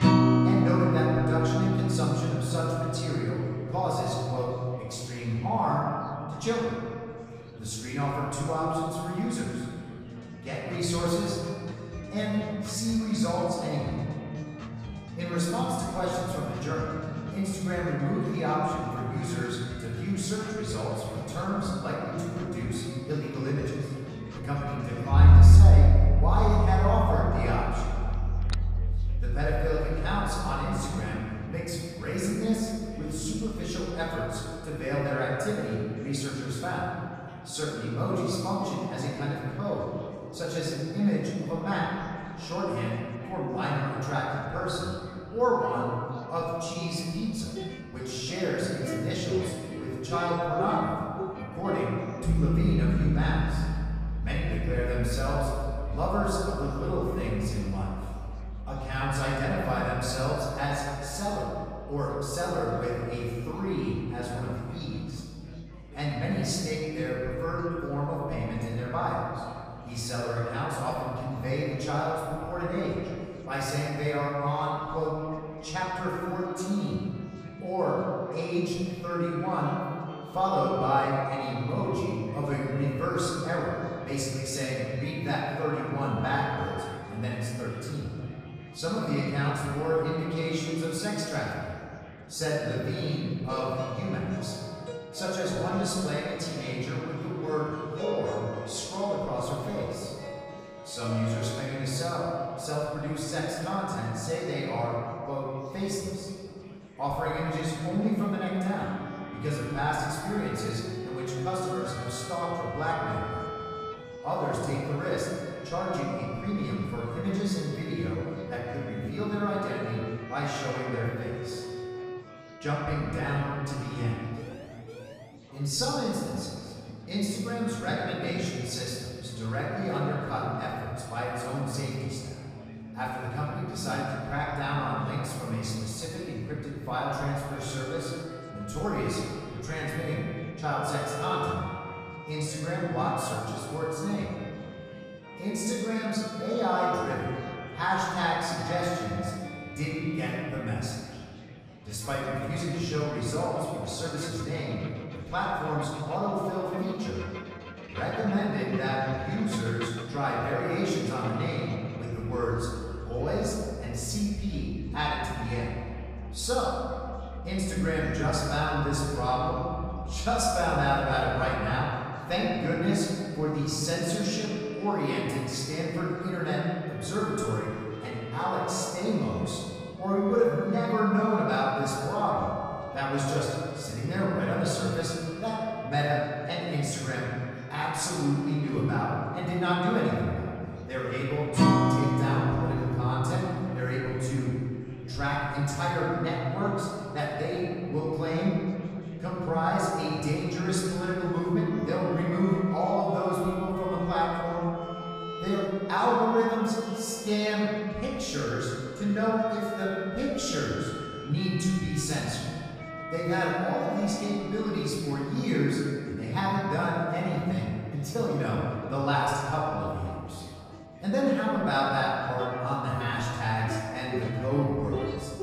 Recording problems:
room echo; strong; dies away in 2.1 s
off-mic speech; far
background music; loud; throughout; 3 dB below the speech
chatter from many people; faint; throughout; 20 dB below the speech
phone ringing; faint; at 28 s; peak 10 dB below the speech
siren; faint; from 2:04 to 2:05; peak 15 dB below the speech

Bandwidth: 15 kHz